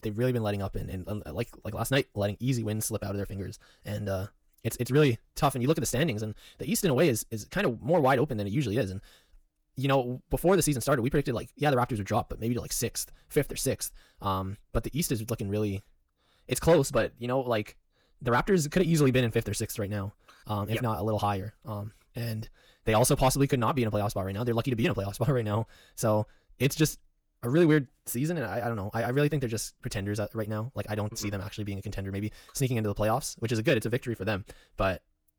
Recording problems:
wrong speed, natural pitch; too fast; 1.6 times normal speed

